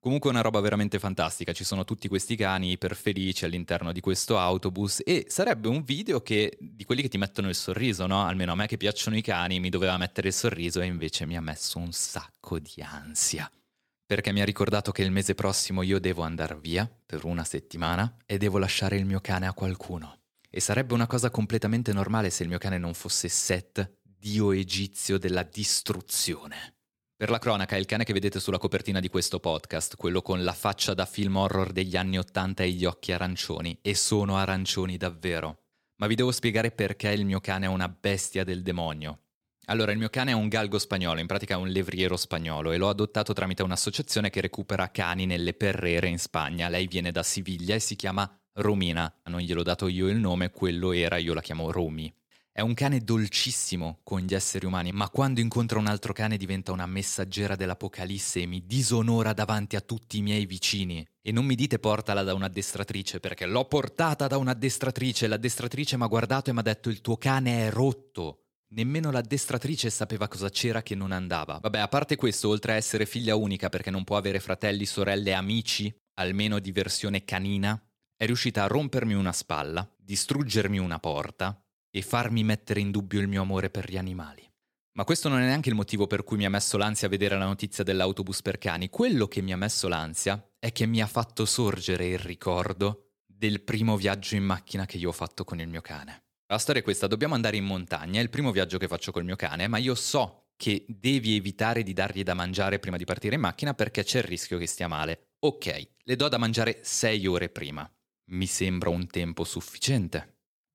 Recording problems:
none

